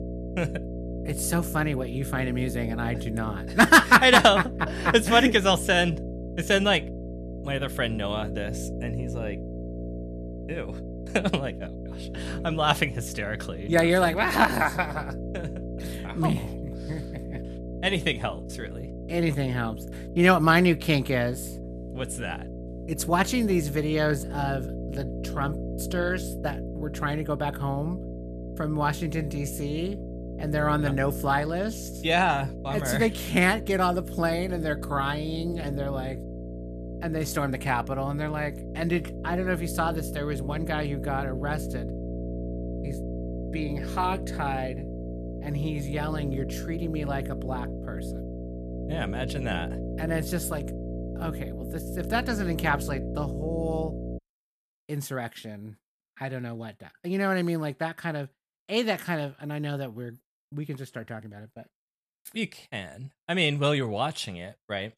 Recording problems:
electrical hum; noticeable; until 54 s; 60 Hz, 15 dB below the speech

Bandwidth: 14.5 kHz